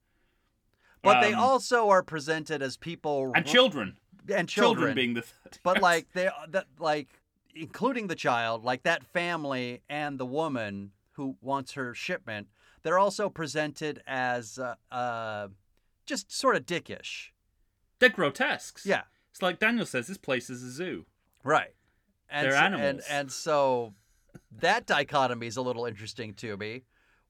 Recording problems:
none

